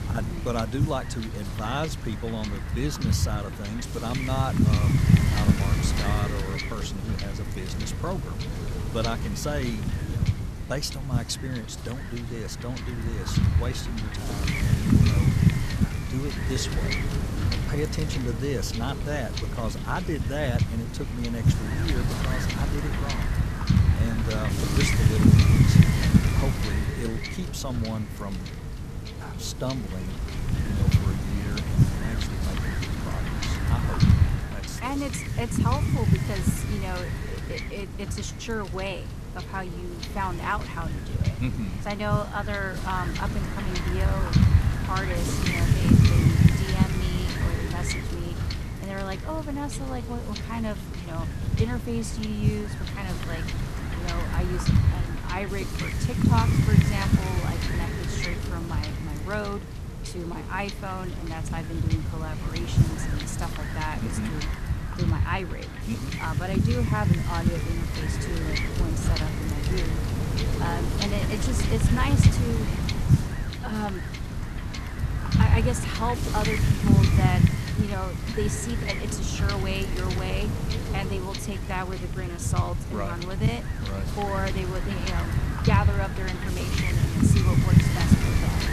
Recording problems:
wind noise on the microphone; heavy; as loud as the speech

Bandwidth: 14 kHz